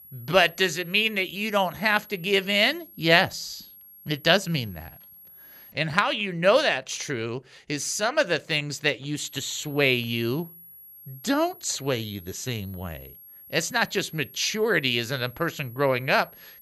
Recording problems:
high-pitched whine; faint; until 5.5 s and from 9.5 s on; 11.5 kHz, 20 dB below the speech

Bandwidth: 14.5 kHz